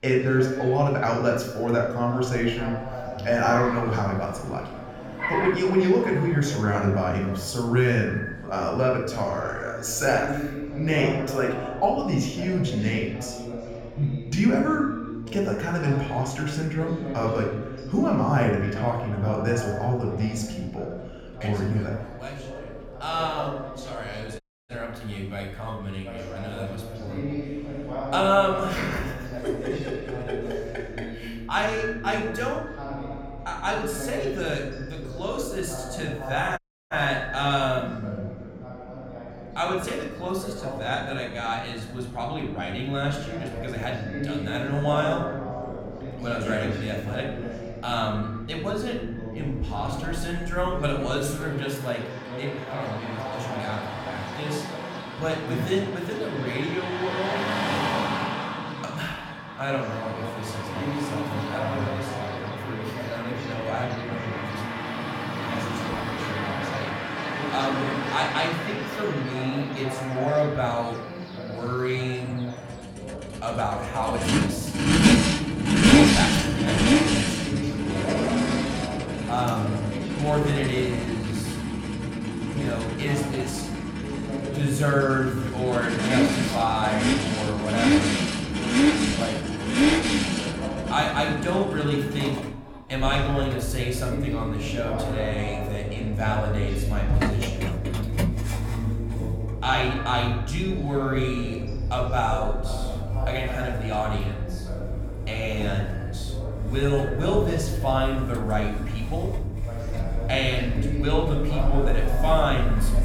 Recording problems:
echo of what is said; noticeable; throughout; 90 ms later, 15 dB below the speech
room echo; noticeable; dies away in 0.6 s
off-mic speech; somewhat distant
traffic noise; loud; throughout; as loud as the speech
voice in the background; loud; throughout; 9 dB below the speech
audio cutting out; at 24 s and at 37 s

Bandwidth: 17 kHz